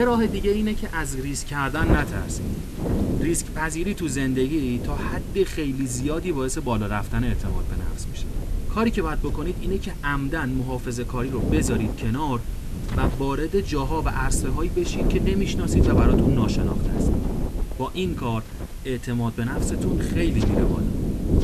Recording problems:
wind noise on the microphone; heavy; 4 dB below the speech
hiss; noticeable; throughout; 20 dB below the speech
low rumble; noticeable; throughout; 20 dB below the speech
voice in the background; faint; throughout; 25 dB below the speech
abrupt cut into speech; at the start

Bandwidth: 13.5 kHz